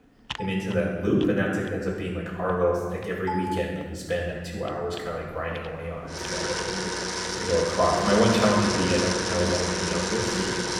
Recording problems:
off-mic speech; far
room echo; noticeable; dies away in 1.4 s
household noises; loud; throughout; 1 dB below the speech

